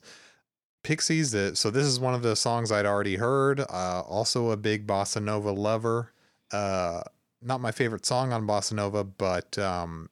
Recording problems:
none

